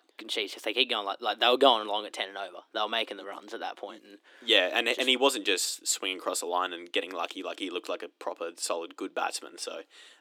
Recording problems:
thin; somewhat; fading below 300 Hz

